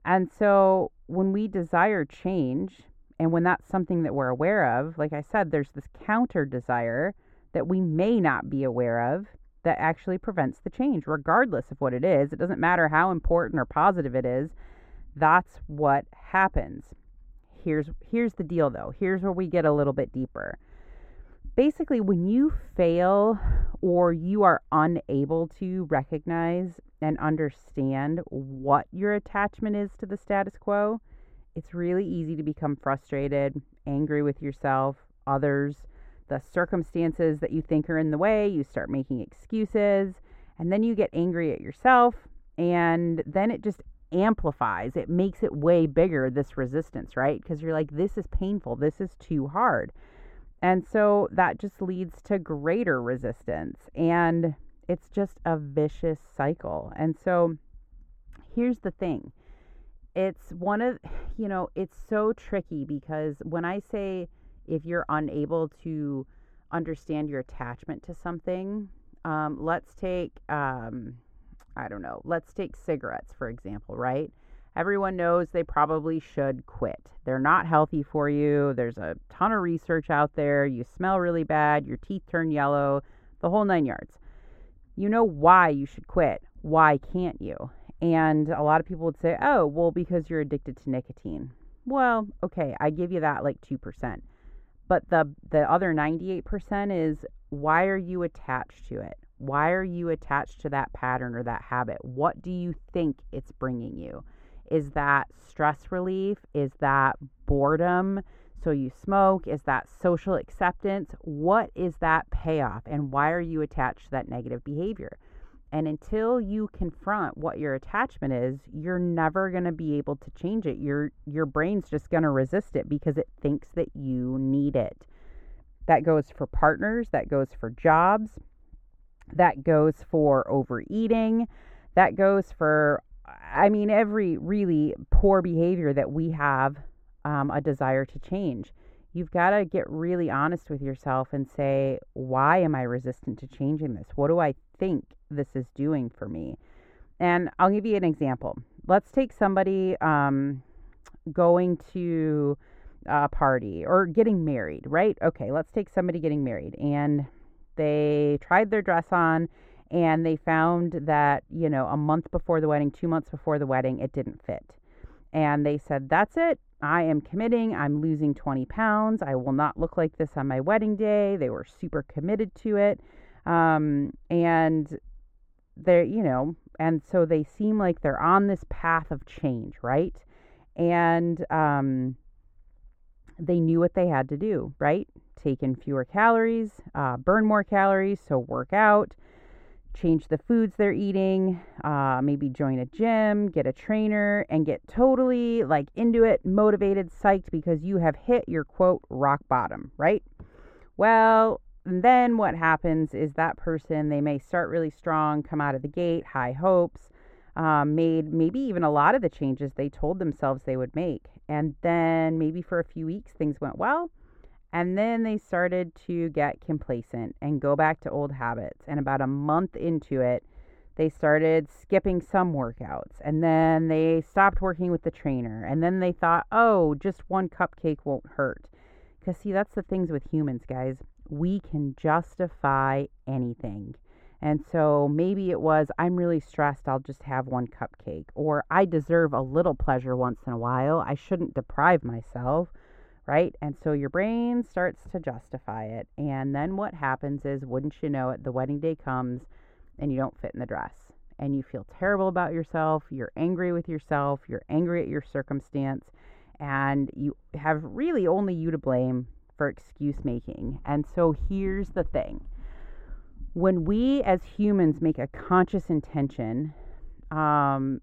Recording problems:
muffled; very; fading above 2 kHz

